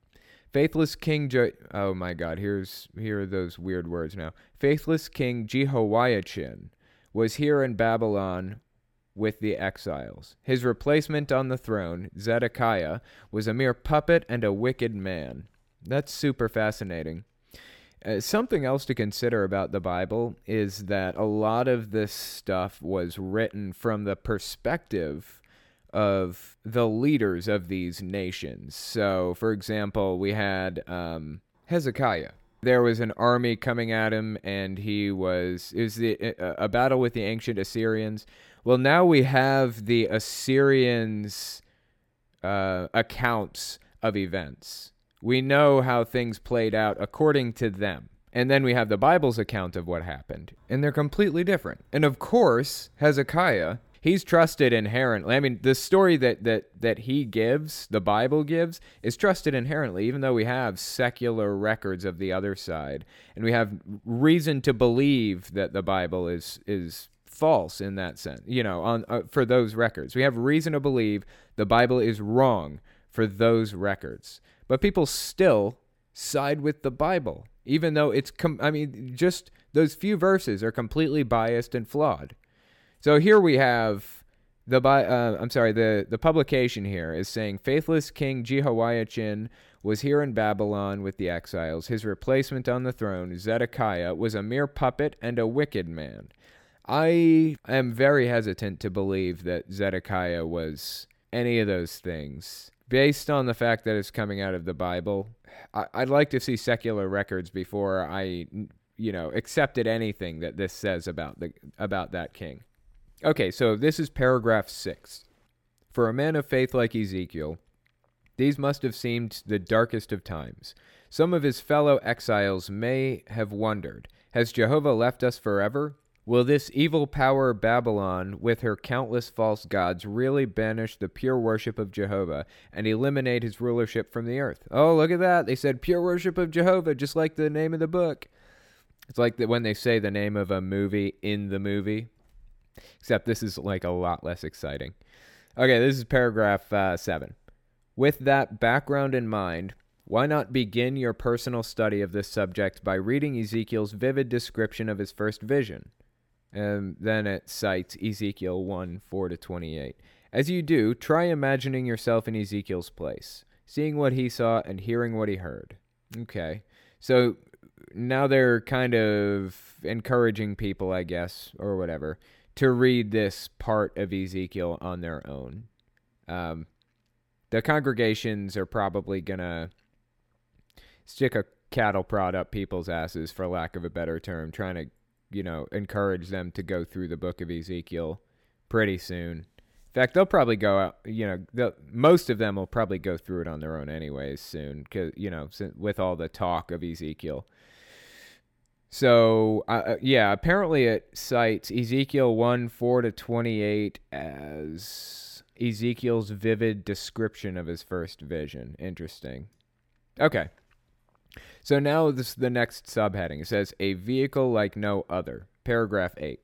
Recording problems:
none

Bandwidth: 17 kHz